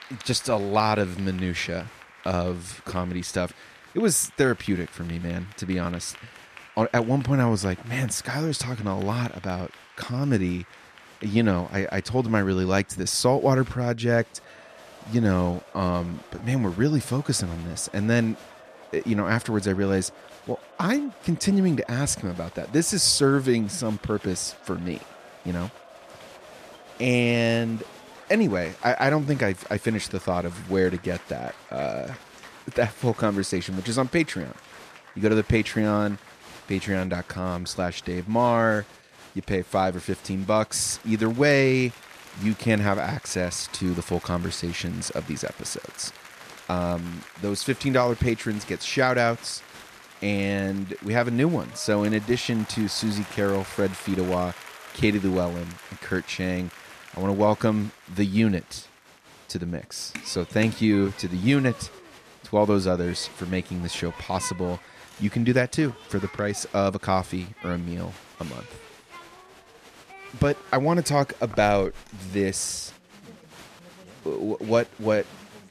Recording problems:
crowd noise; noticeable; throughout; 20 dB below the speech

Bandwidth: 14 kHz